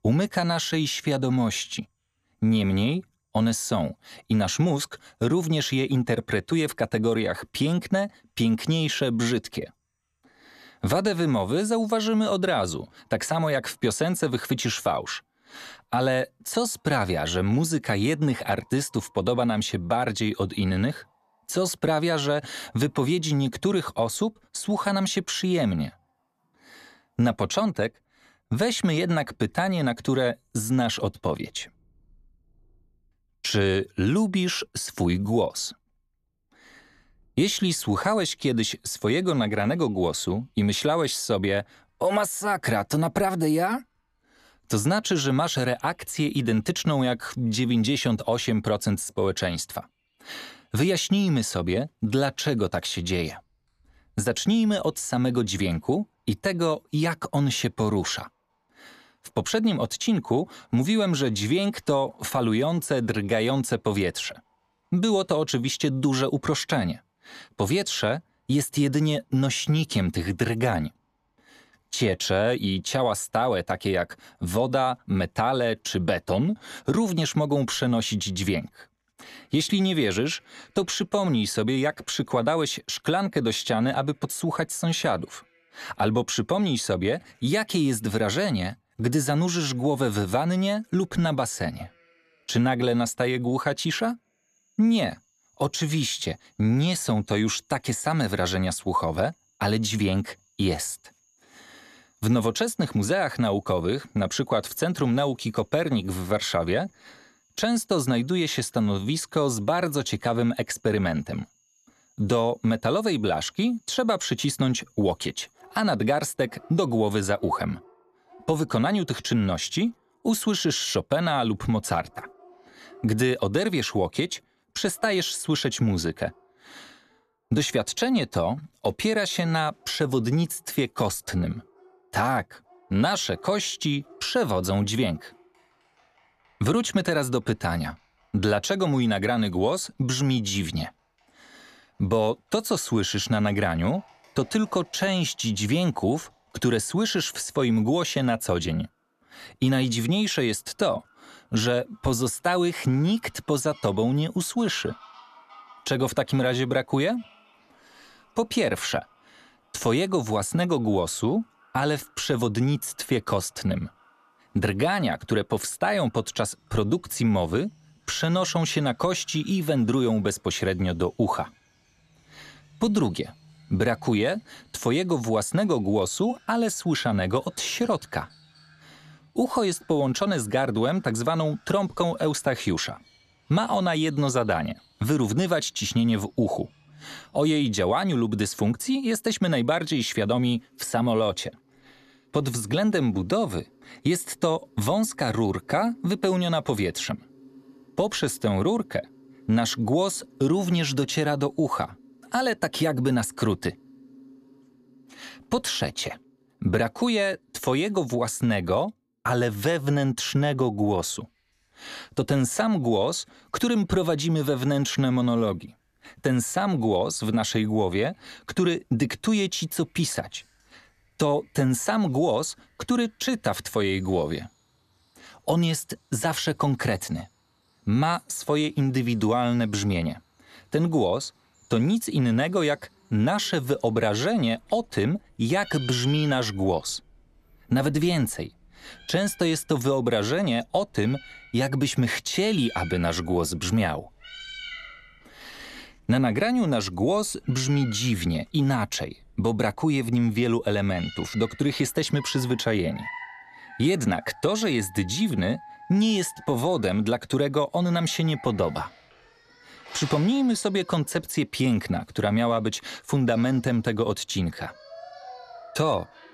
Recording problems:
animal sounds; faint; throughout; 25 dB below the speech

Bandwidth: 14 kHz